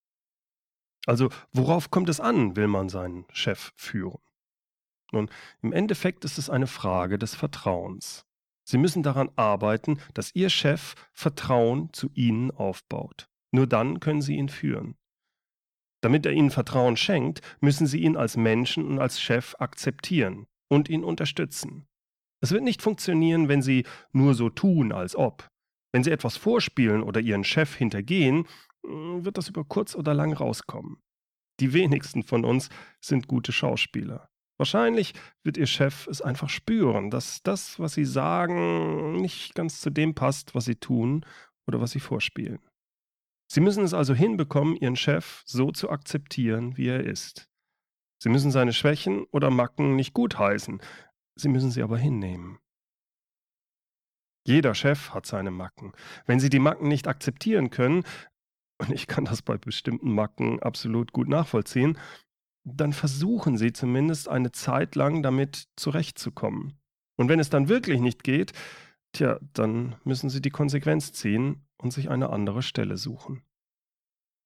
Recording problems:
none

